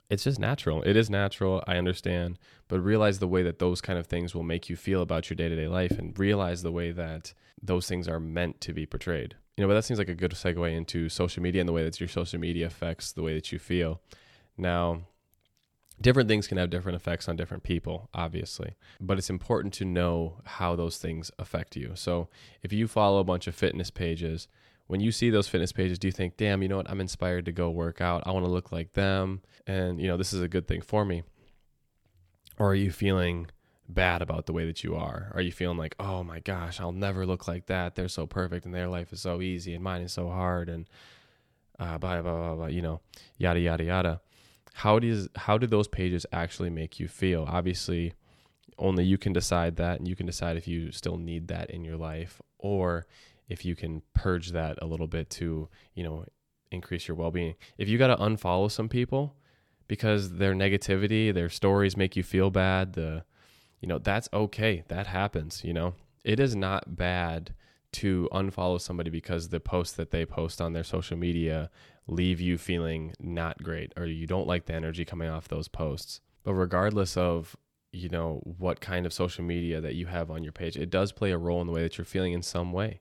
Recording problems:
none

